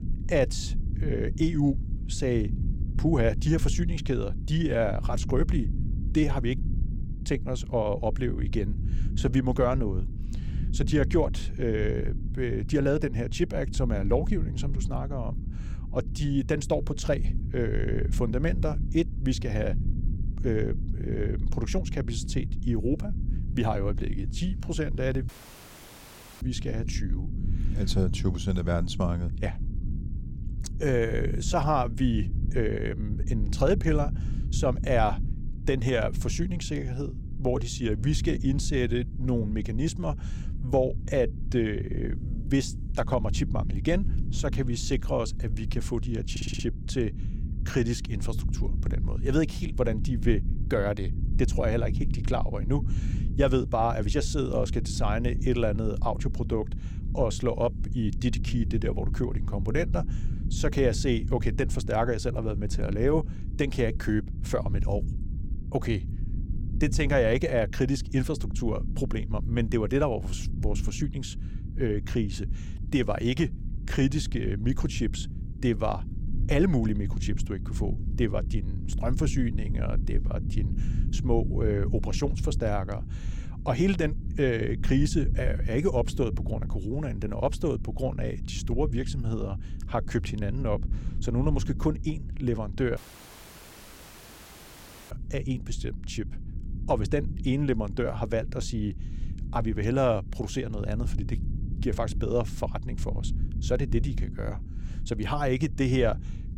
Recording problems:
low rumble; noticeable; throughout; 15 dB below the speech
audio cutting out; filled with static; at 25 s for 1 s and at 1:33 for 2 s
audio stuttering; at 46 s

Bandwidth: 16.5 kHz